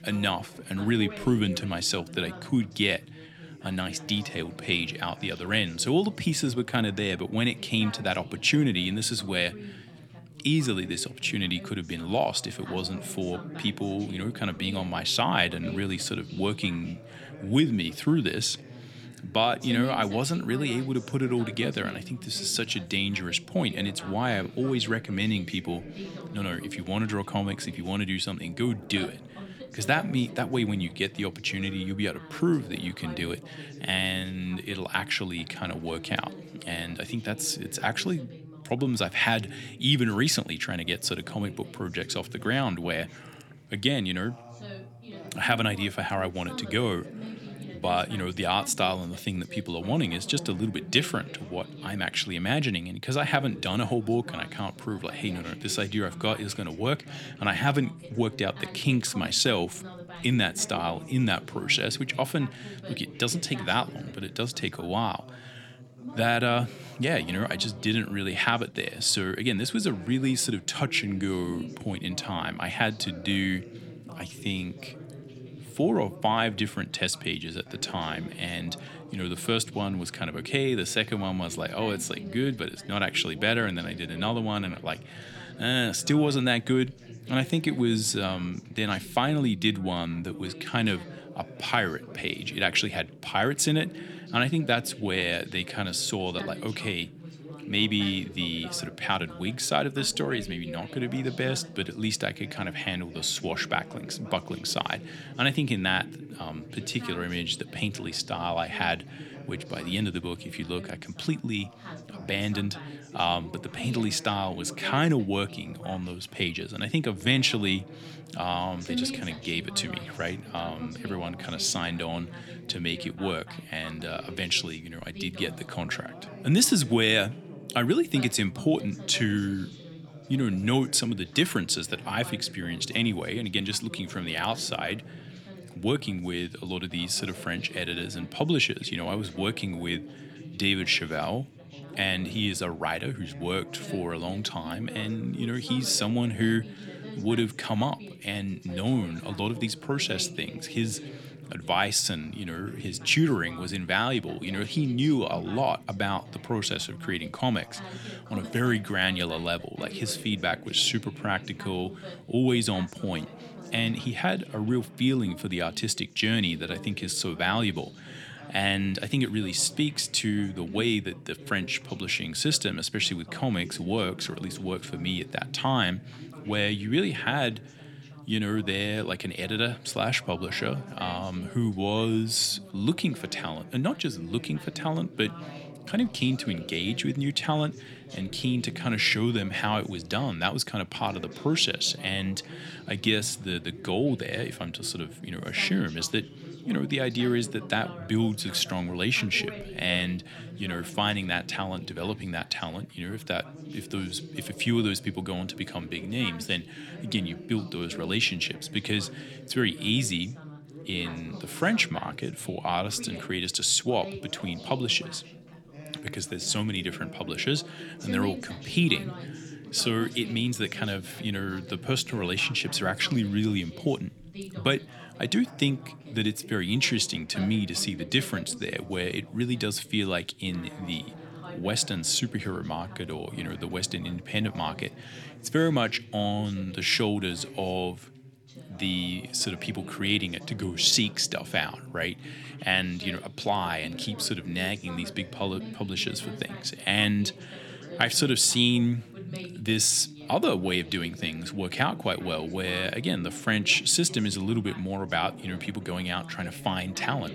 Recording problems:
background chatter; noticeable; throughout; 2 voices, 15 dB below the speech

